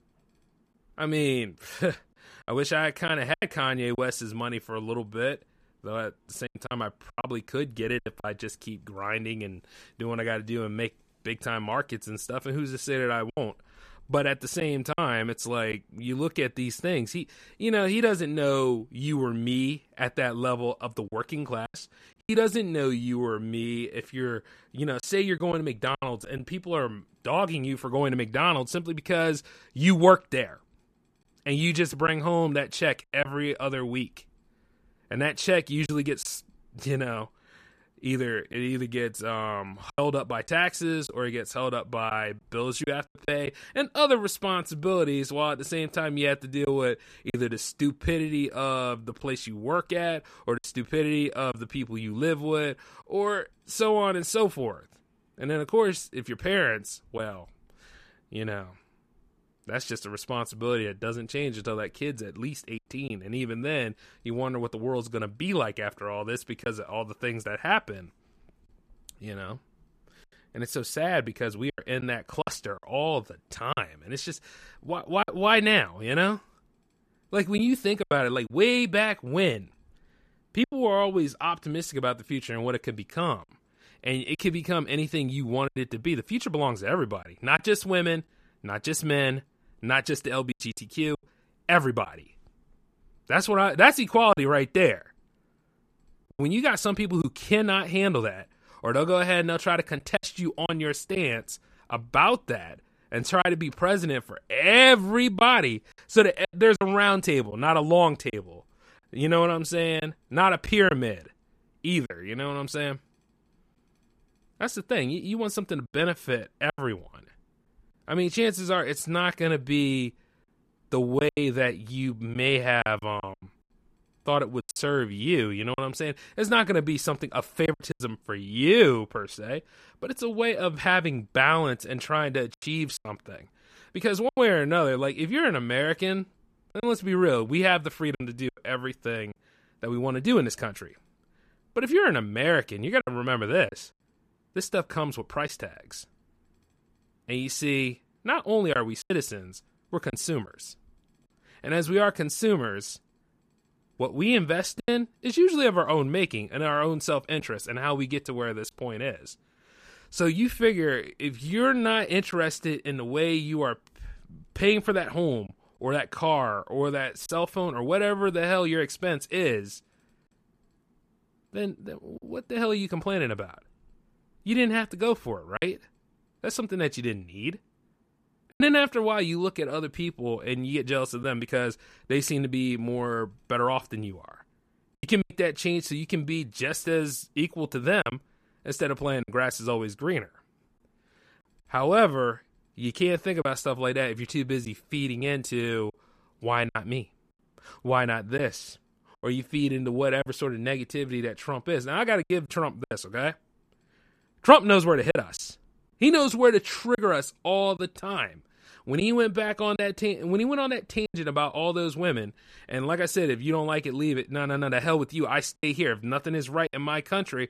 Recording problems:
choppy; occasionally; 4% of the speech affected

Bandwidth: 14.5 kHz